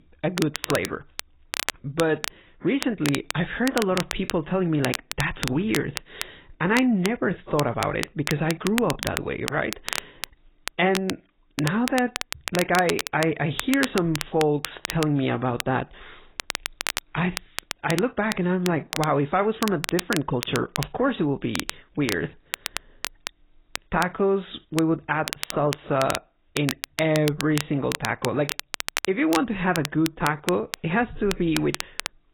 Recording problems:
garbled, watery; badly; nothing above 4 kHz
crackle, like an old record; loud; 7 dB below the speech

